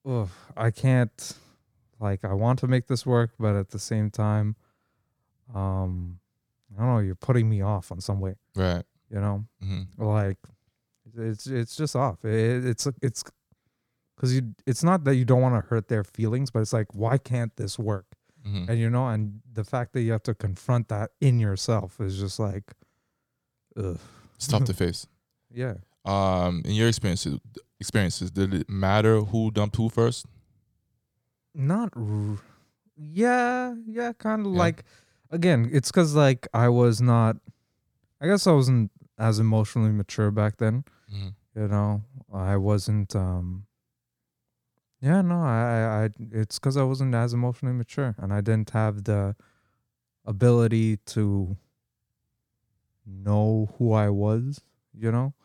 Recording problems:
uneven, jittery; strongly; from 3 to 48 s

